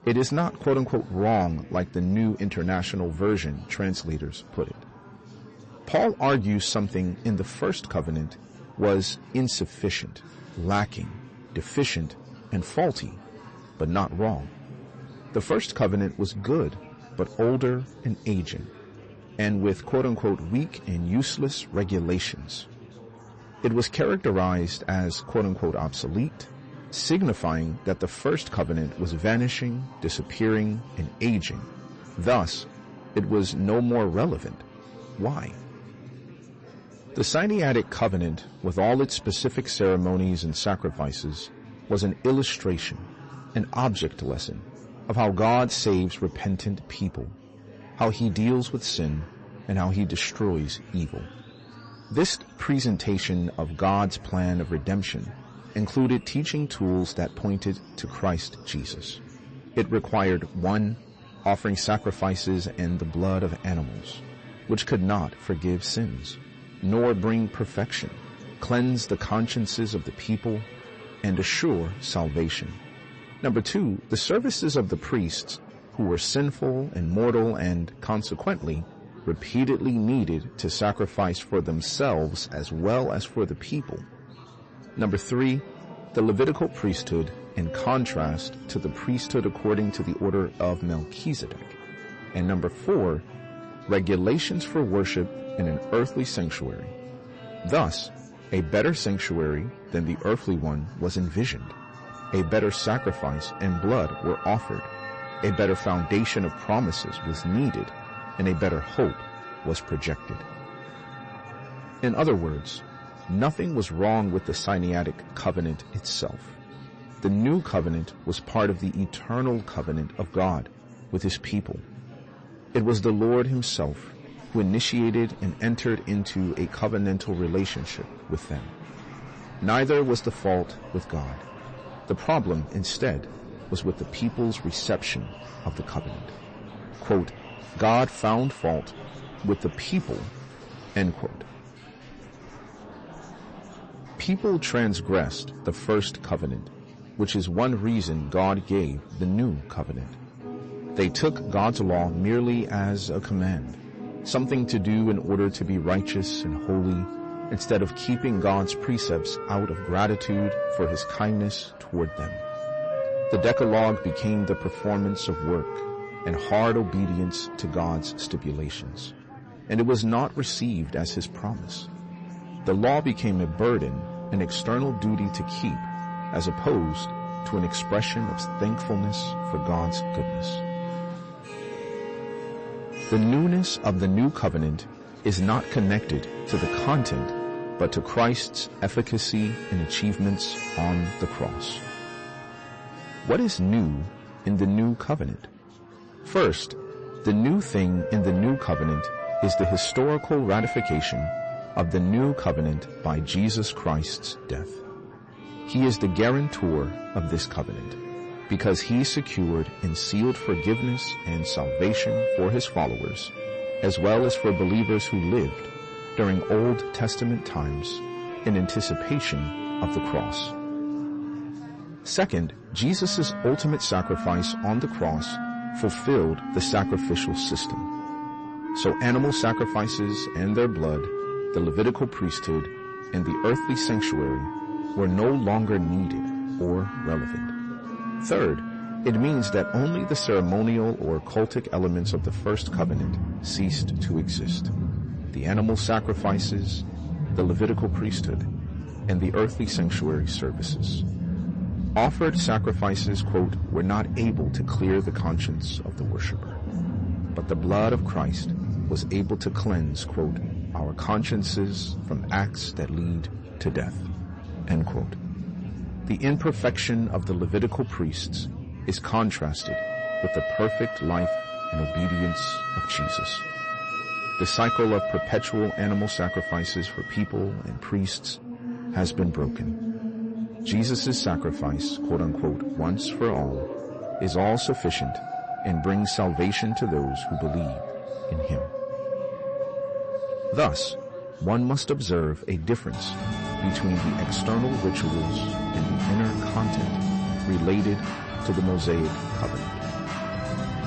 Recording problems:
distortion; slight; 10 dB below the speech
garbled, watery; slightly; nothing above 8 kHz
background music; loud; throughout; 6 dB below the speech
chatter from many people; noticeable; throughout; 20 dB below the speech

